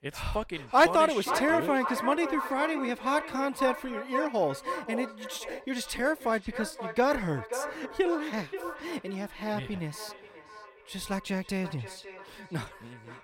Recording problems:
echo of what is said; strong; throughout; 530 ms later, 7 dB below the speech

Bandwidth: 16.5 kHz